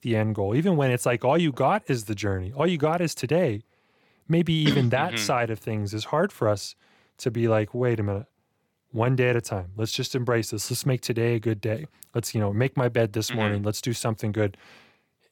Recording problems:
none

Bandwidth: 17 kHz